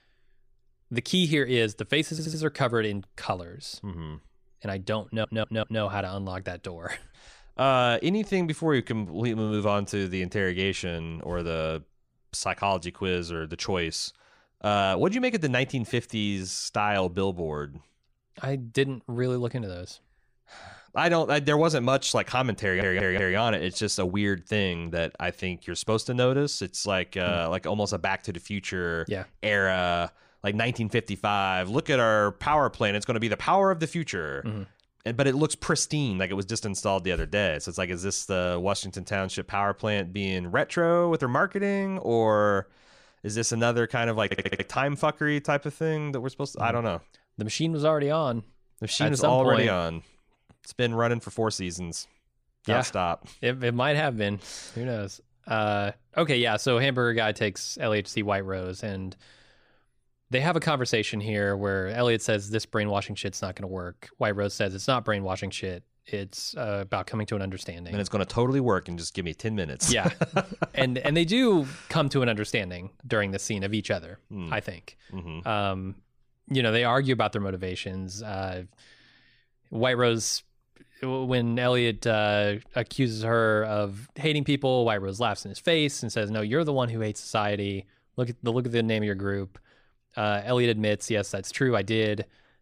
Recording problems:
audio stuttering; 4 times, first at 2 s

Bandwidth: 15 kHz